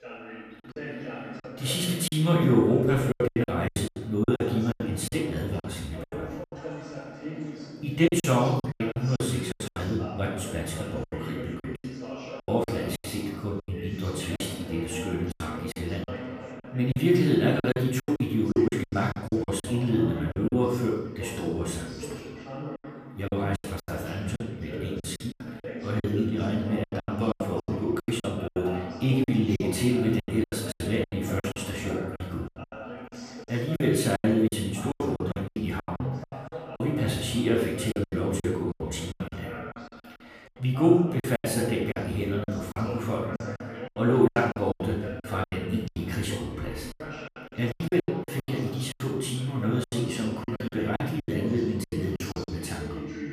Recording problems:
off-mic speech; far
room echo; noticeable; dies away in 0.8 s
background chatter; noticeable; throughout; 4 voices, 10 dB below the speech
choppy; very; 15% of the speech affected

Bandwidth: 15 kHz